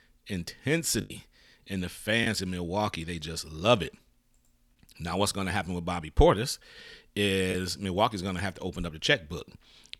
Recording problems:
choppy; occasionally; from 1 to 2.5 s; 3% of the speech affected

